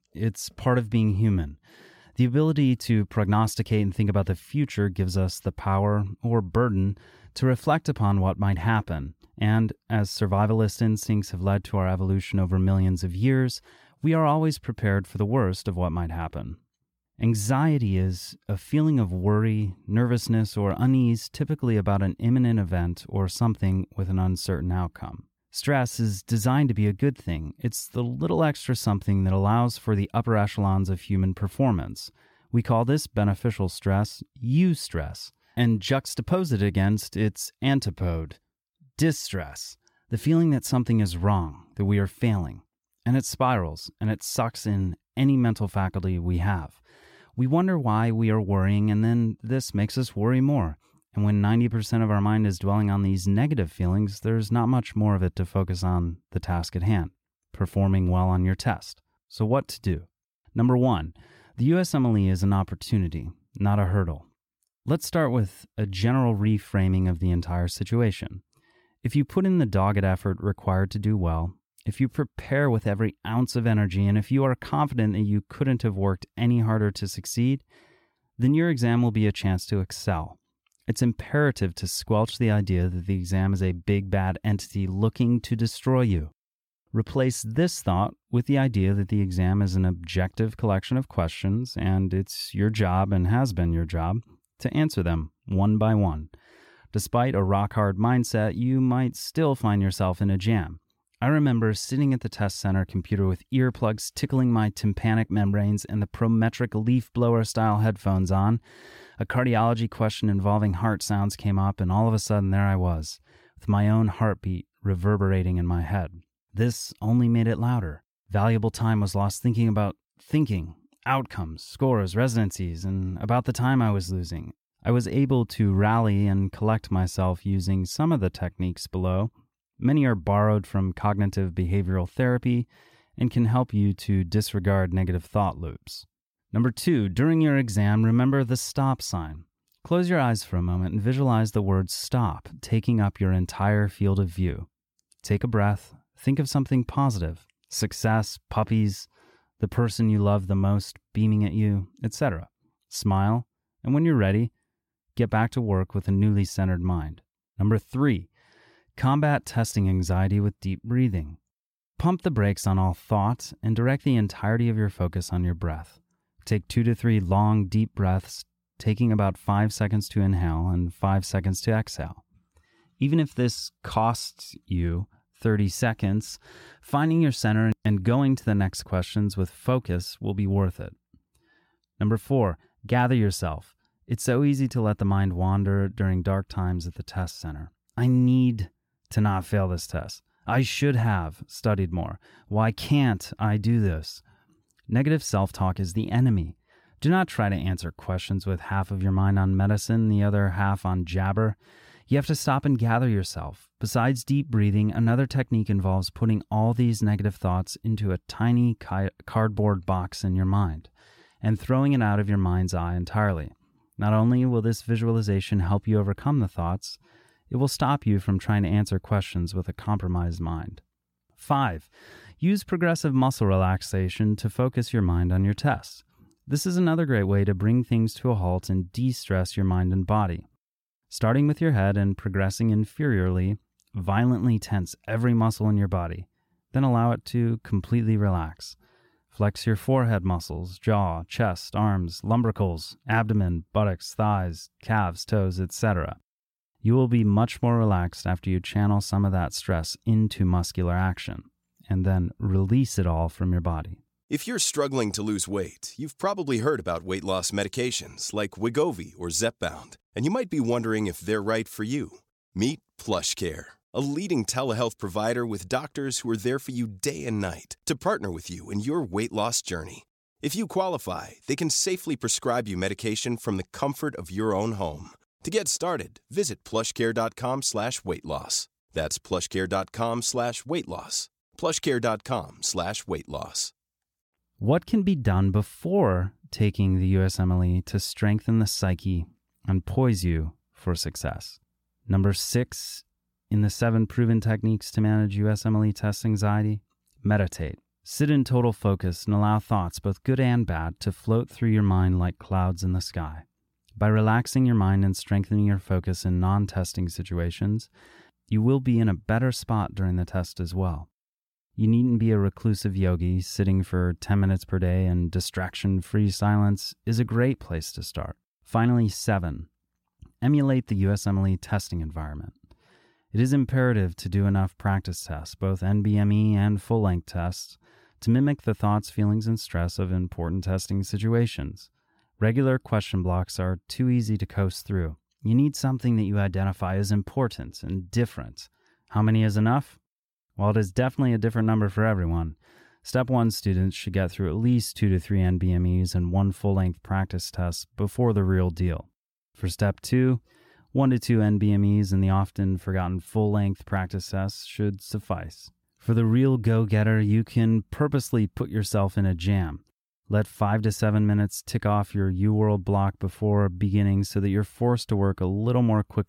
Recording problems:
none

